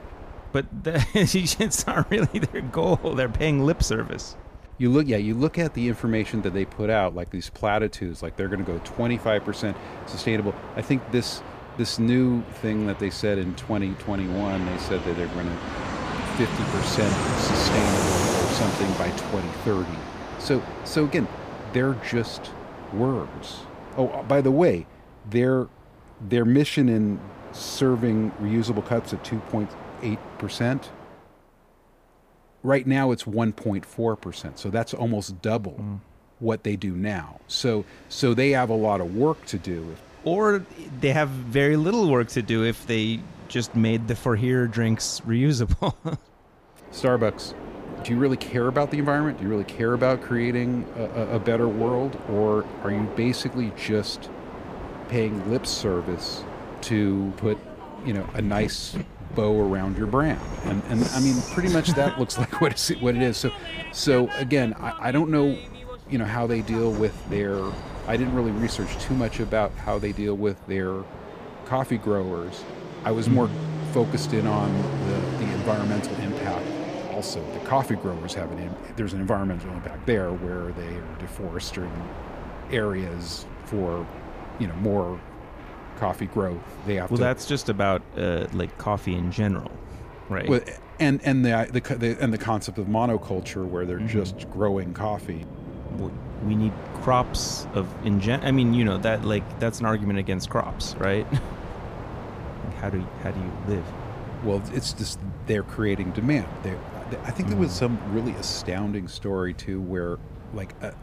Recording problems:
train or aircraft noise; loud; throughout; 9 dB below the speech

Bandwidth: 15 kHz